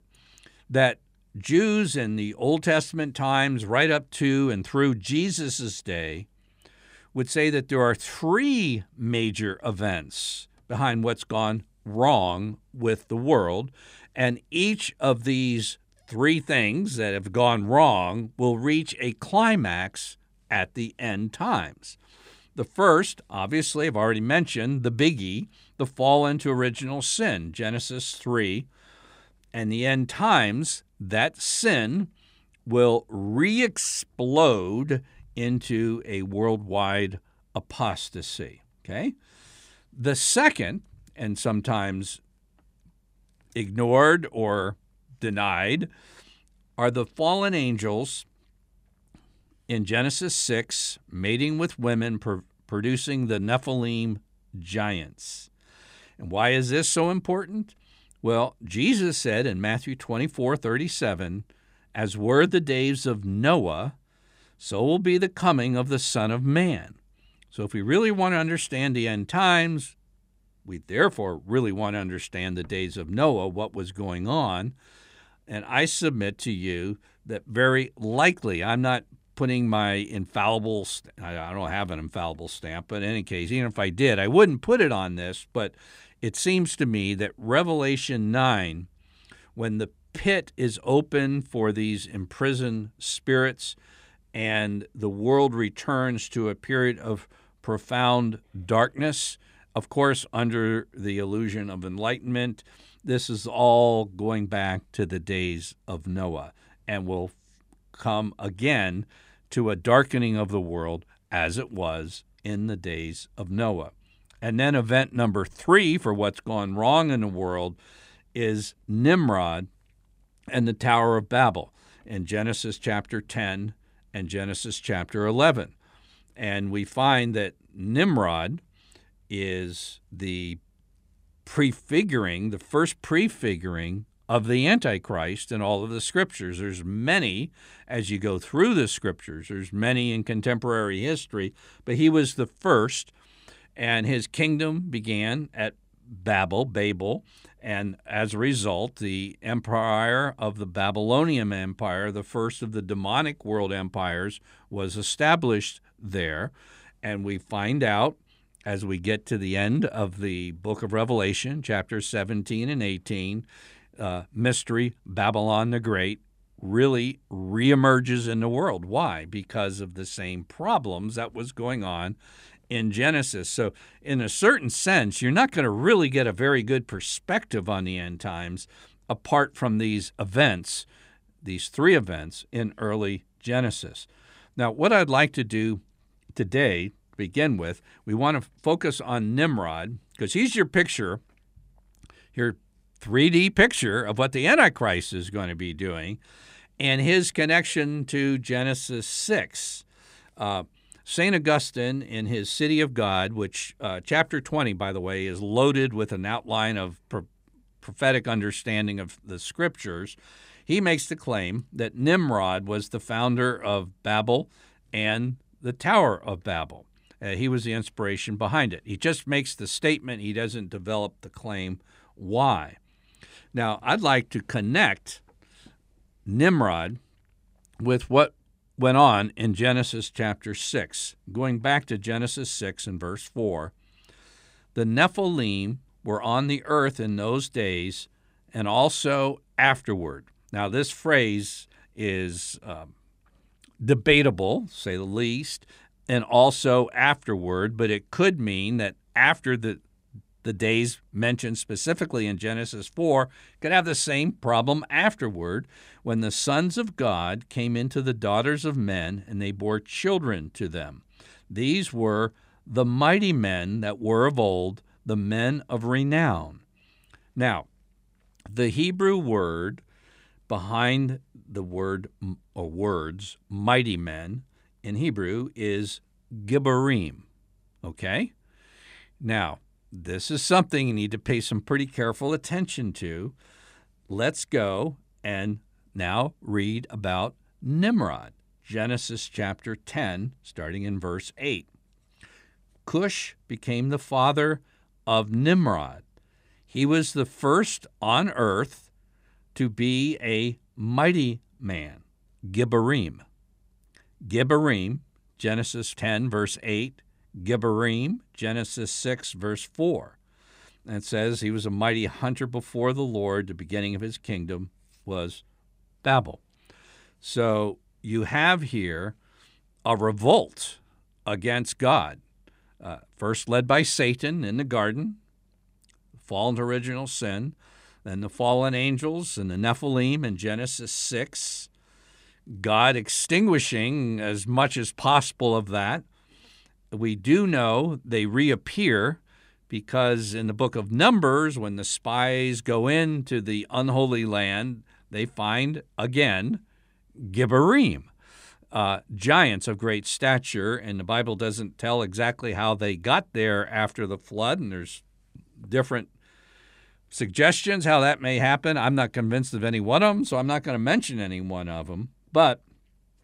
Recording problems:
none

